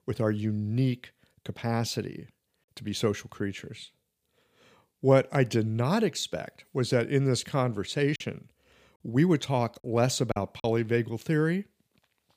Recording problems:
choppy; occasionally; from 8 to 11 s; 5% of the speech affected

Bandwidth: 15 kHz